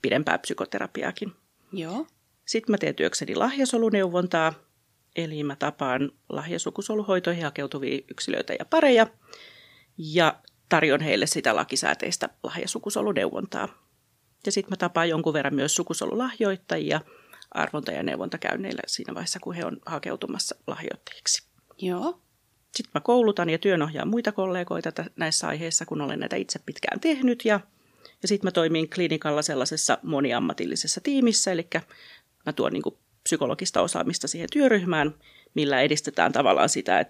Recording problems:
none

